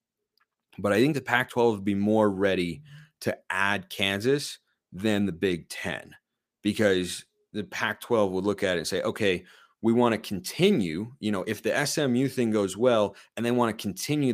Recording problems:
abrupt cut into speech; at the end

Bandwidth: 15 kHz